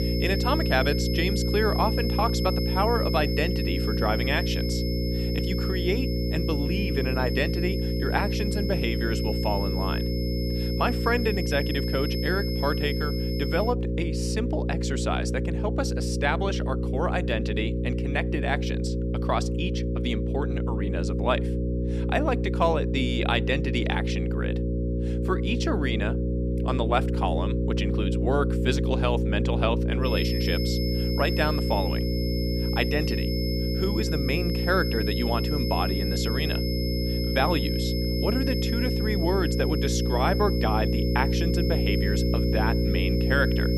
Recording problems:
electrical hum; loud; throughout; 60 Hz, 5 dB below the speech
high-pitched whine; loud; until 14 s and from 30 s on; 5 kHz, 6 dB below the speech

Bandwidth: 14.5 kHz